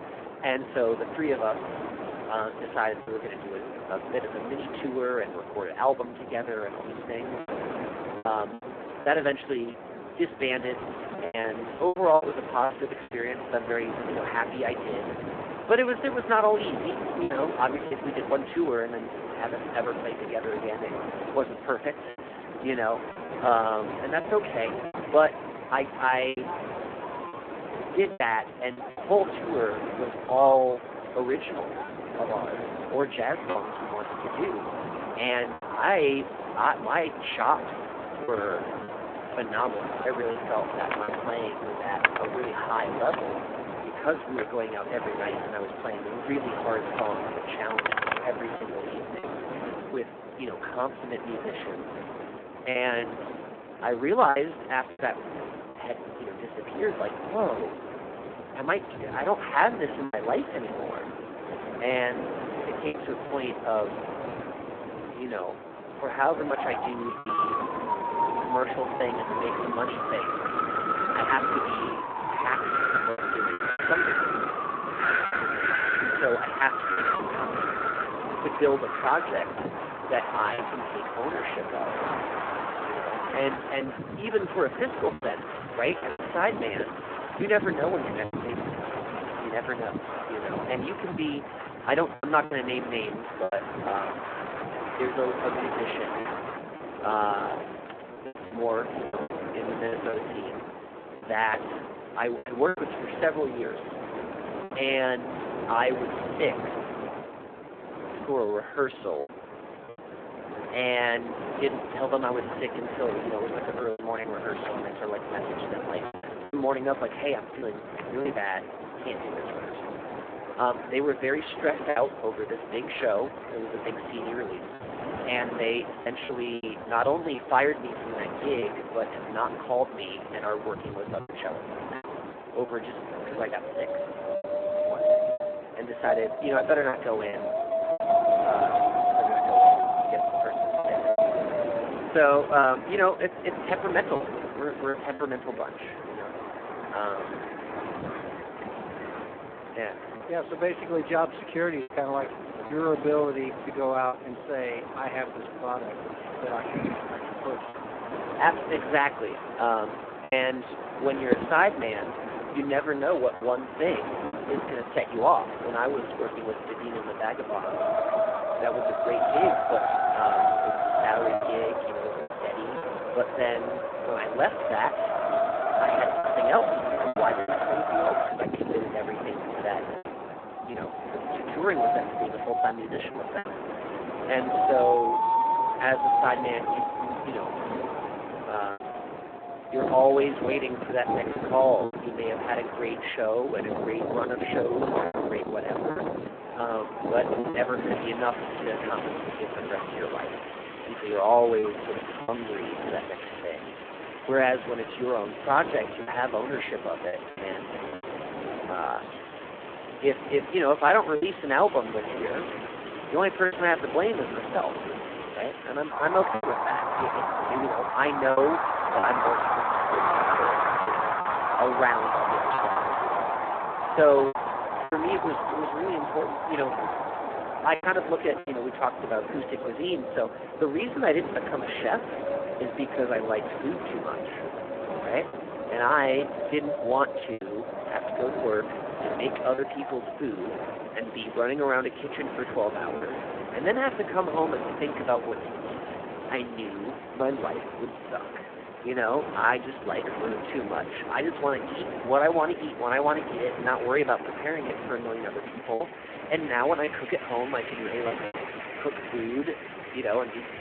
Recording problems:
phone-call audio; poor line
wind in the background; loud; throughout; 3 dB below the speech
choppy; occasionally; 4% of the speech affected

